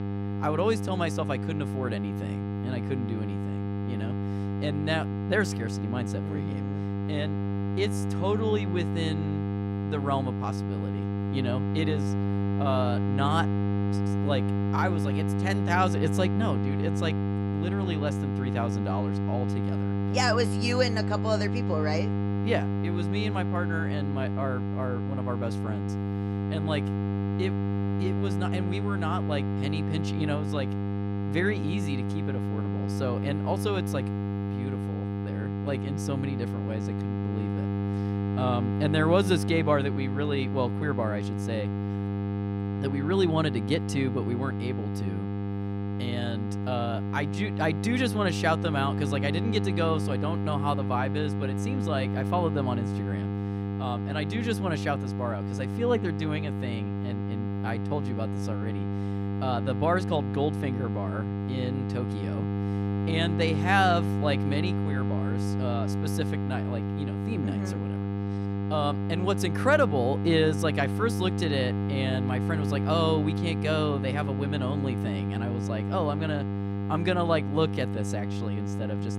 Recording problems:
electrical hum; loud; throughout; 50 Hz, 6 dB below the speech

